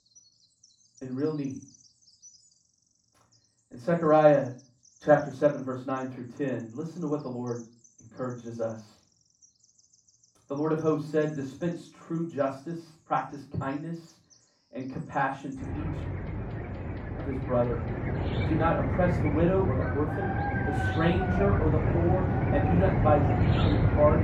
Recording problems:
off-mic speech; far
muffled; very; fading above 2.5 kHz
room echo; slight; dies away in 0.3 s
animal sounds; very loud; throughout; as loud as the speech

